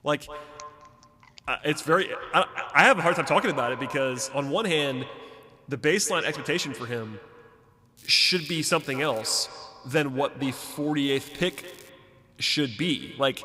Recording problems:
echo of what is said; noticeable; throughout; 210 ms later, 15 dB below the speech
crackling; faint; from 8 to 9.5 s and at 11 s; 25 dB below the speech

